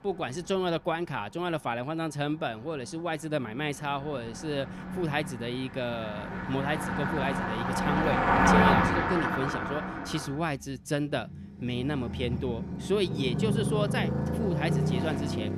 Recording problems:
traffic noise; very loud; throughout; 3 dB above the speech

